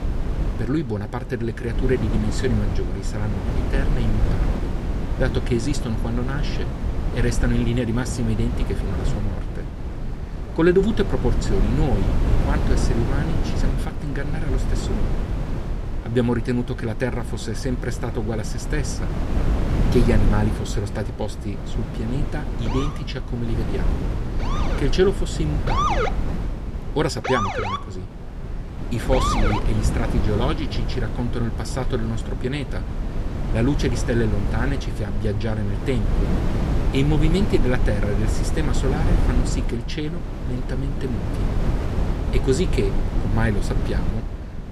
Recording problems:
wind noise on the microphone; heavy; 5 dB below the speech
siren; loud; from 23 to 30 s; peak 4 dB above the speech

